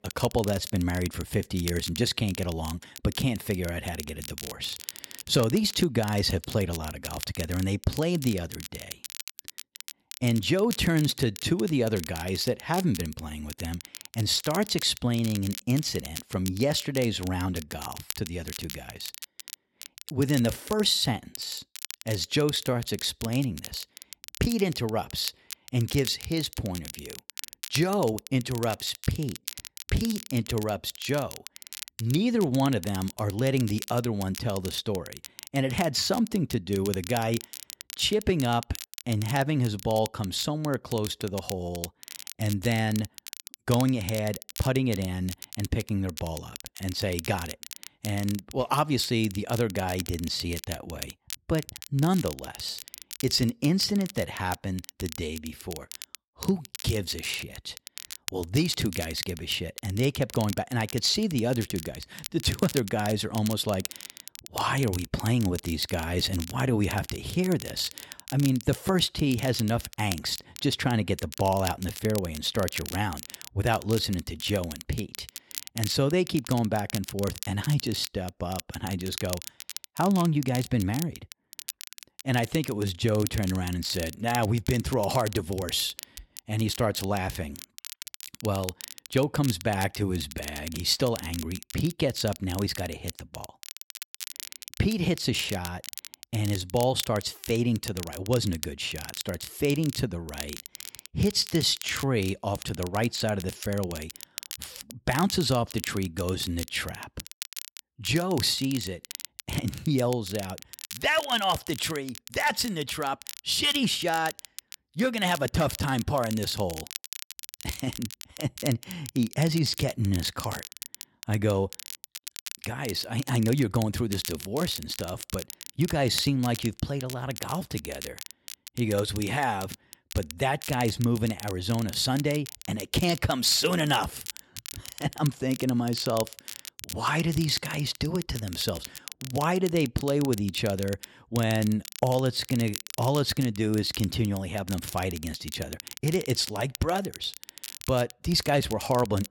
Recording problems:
crackle, like an old record; noticeable; 10 dB below the speech

